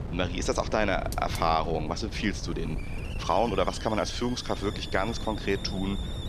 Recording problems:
wind noise on the microphone; occasional gusts; 15 dB below the speech
hiss; noticeable; throughout; 15 dB below the speech

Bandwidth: 14.5 kHz